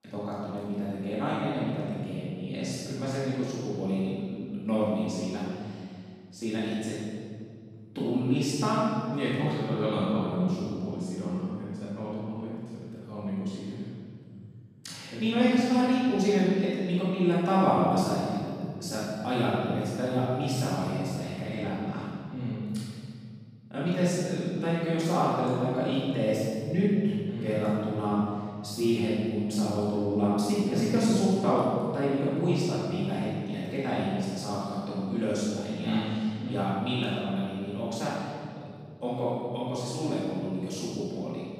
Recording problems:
room echo; strong; dies away in 2.5 s
off-mic speech; far

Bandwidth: 15 kHz